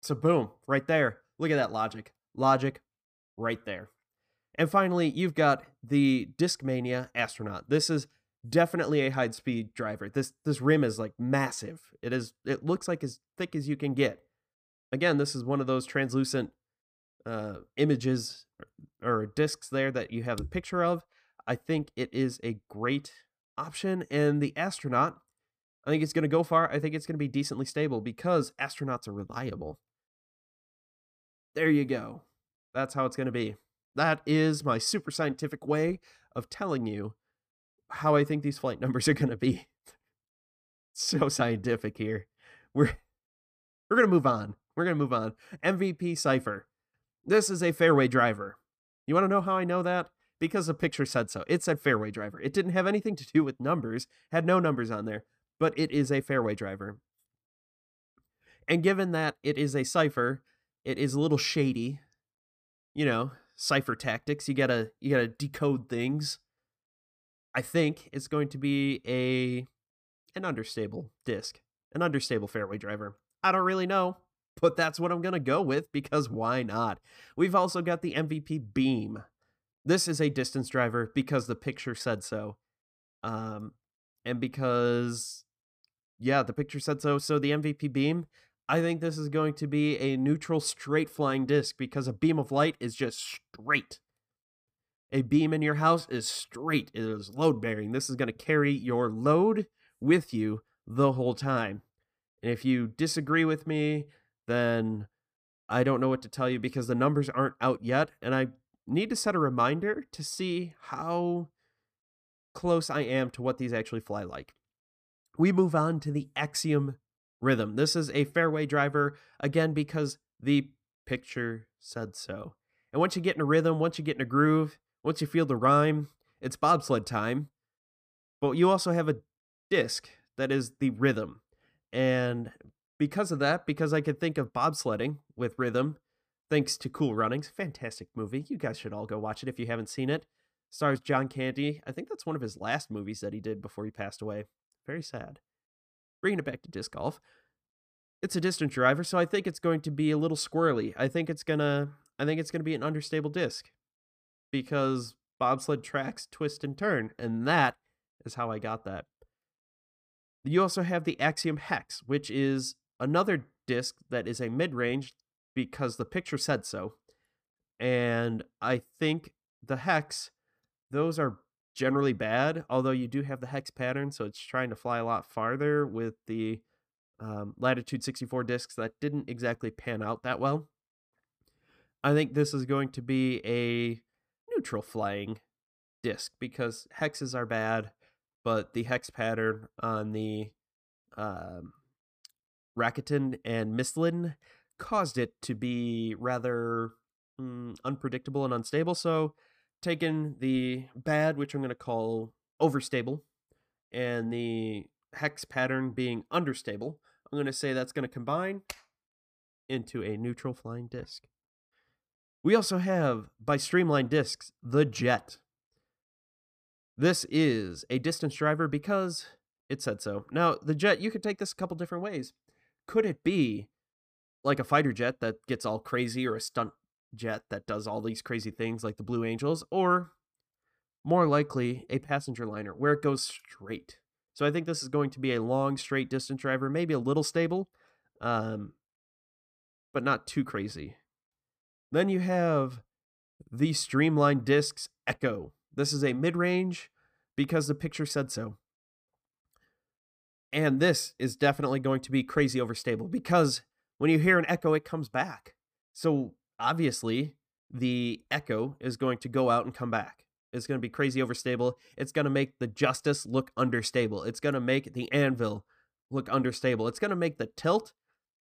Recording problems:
none

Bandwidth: 15 kHz